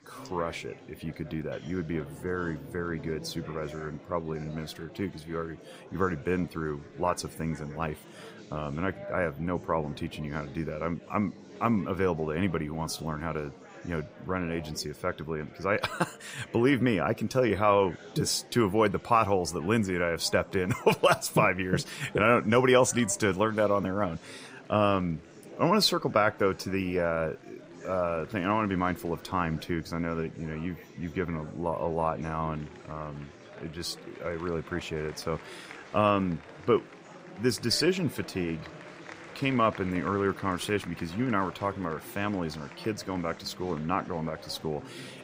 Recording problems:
murmuring crowd; noticeable; throughout; 20 dB below the speech

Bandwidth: 15.5 kHz